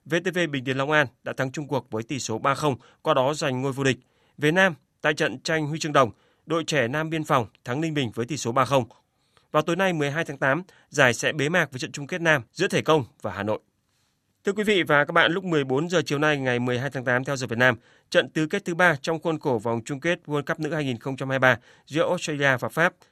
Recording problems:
none

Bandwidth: 13.5 kHz